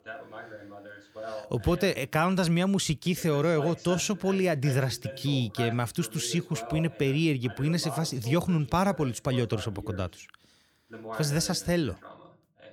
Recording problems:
voice in the background; noticeable; throughout; 15 dB below the speech

